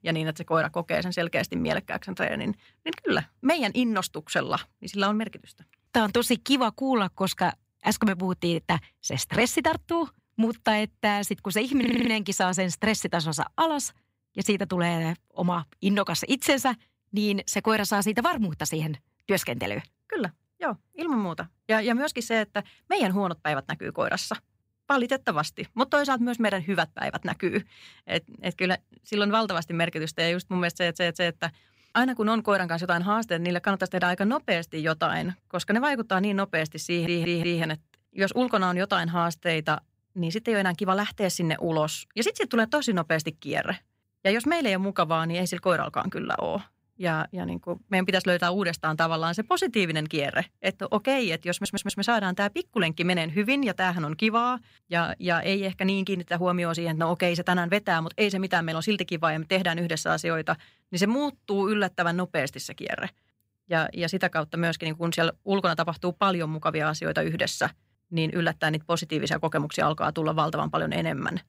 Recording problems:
audio stuttering; 4 times, first at 12 s

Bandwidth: 15.5 kHz